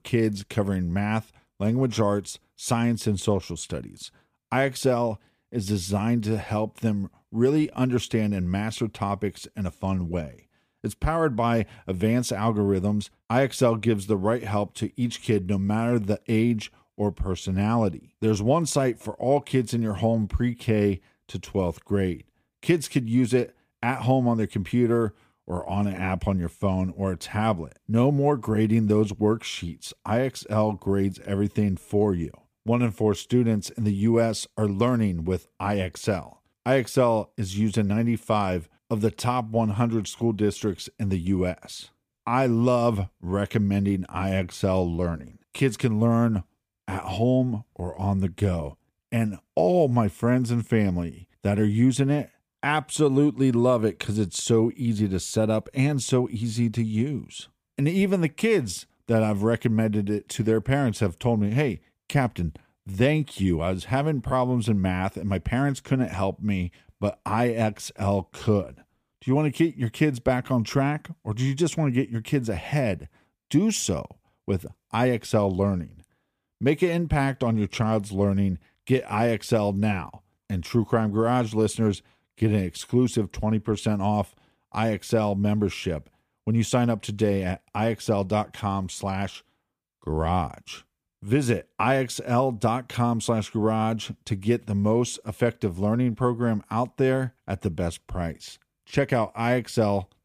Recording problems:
none

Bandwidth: 15 kHz